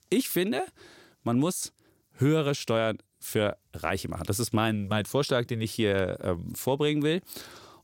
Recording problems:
none

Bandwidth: 16.5 kHz